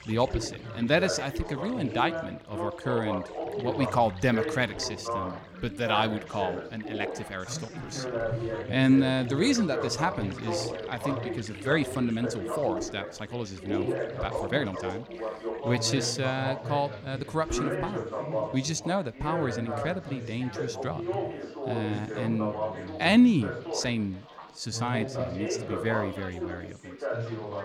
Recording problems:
background chatter; loud; throughout; 4 voices, 5 dB below the speech
rain or running water; faint; throughout; 20 dB below the speech
uneven, jittery; strongly; from 0.5 to 25 s

